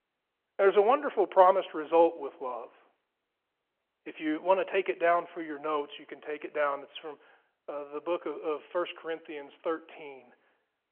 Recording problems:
phone-call audio

